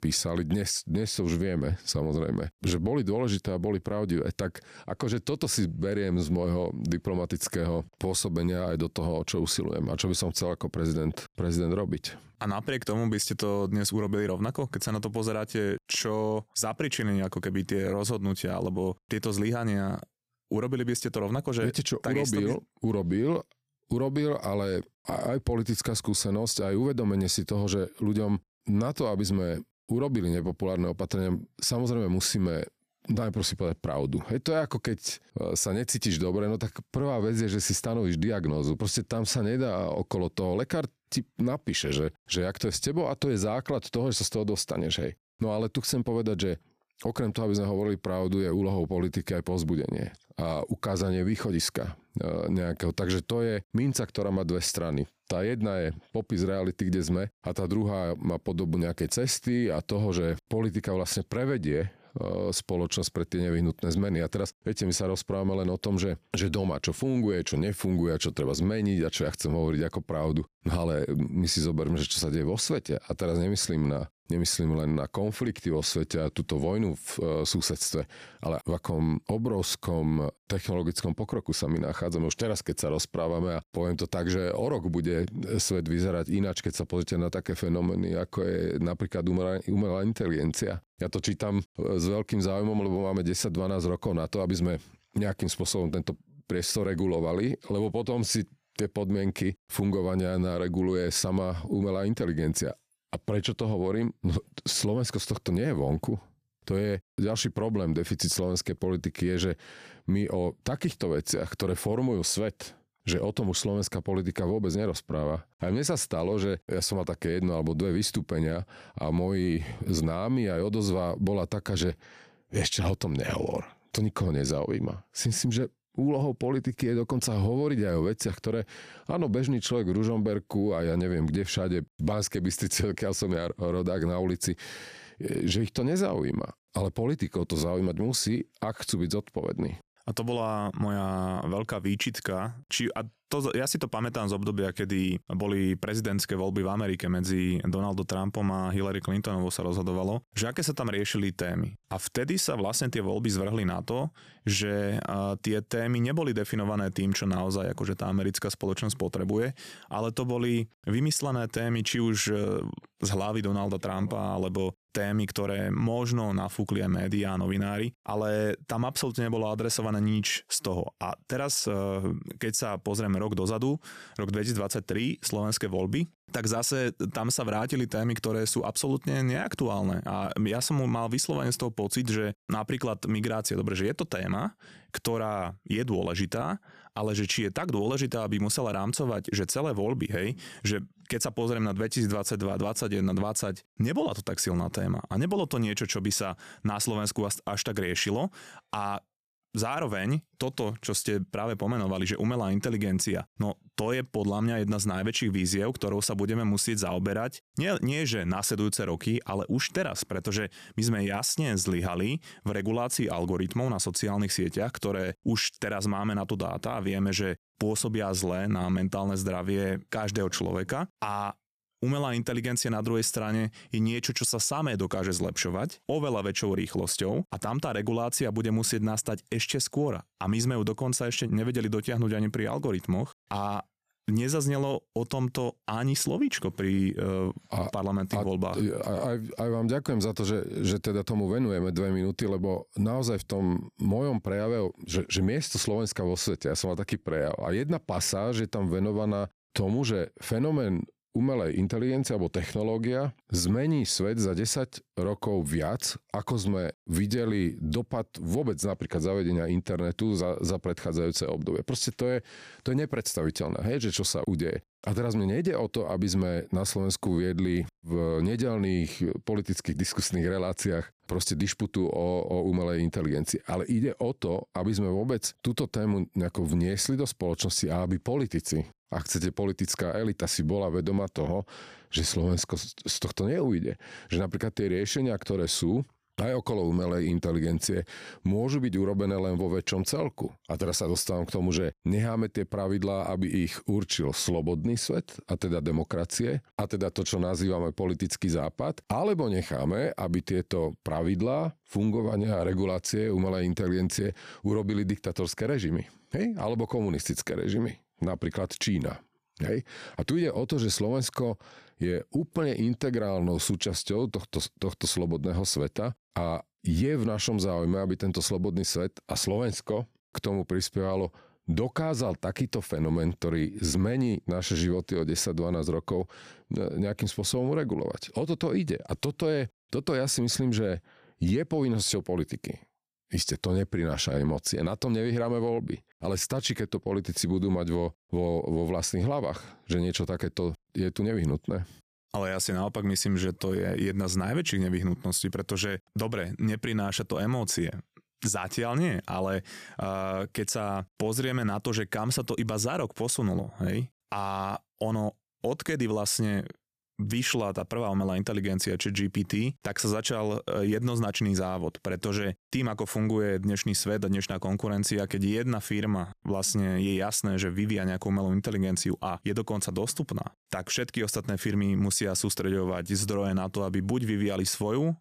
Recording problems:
squashed, flat; somewhat

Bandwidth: 14.5 kHz